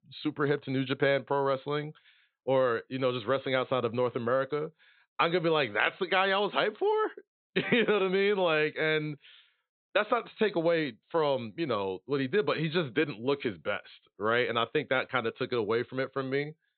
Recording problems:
high frequencies cut off; severe; nothing above 4 kHz

